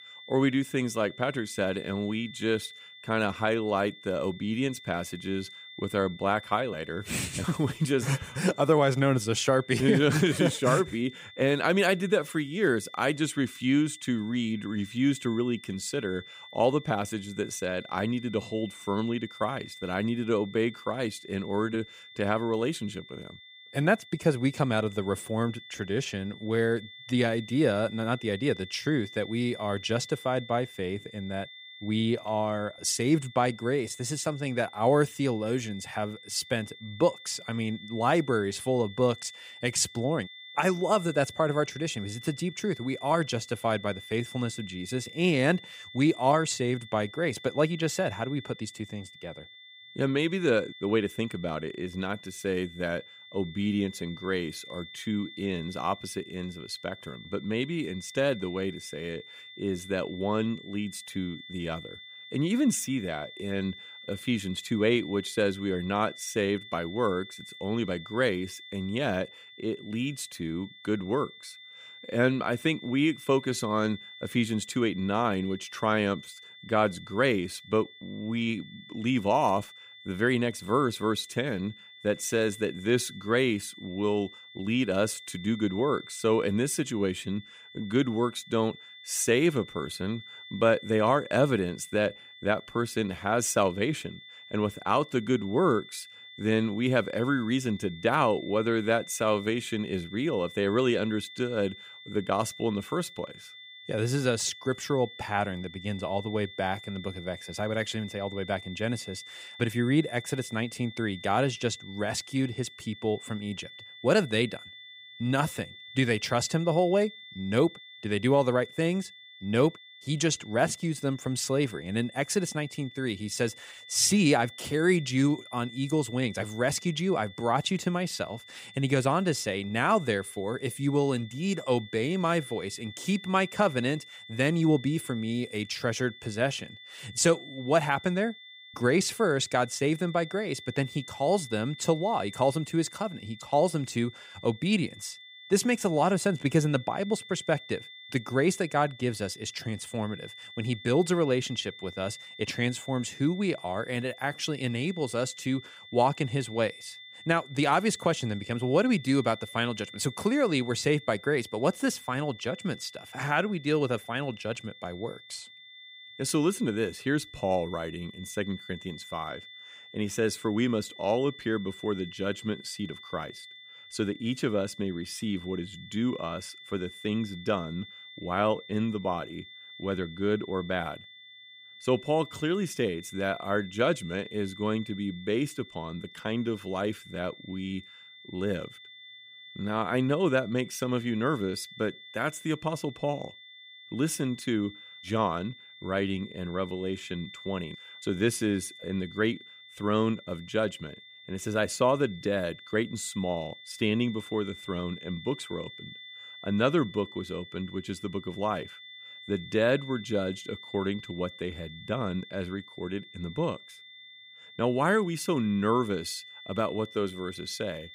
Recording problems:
high-pitched whine; noticeable; throughout; 3.5 kHz, 15 dB below the speech

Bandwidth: 15.5 kHz